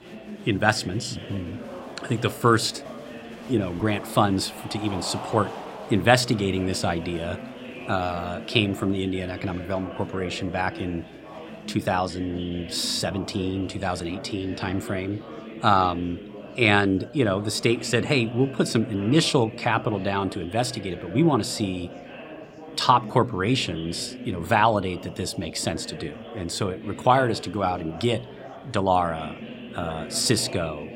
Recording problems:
murmuring crowd; noticeable; throughout; 15 dB below the speech

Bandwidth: 16 kHz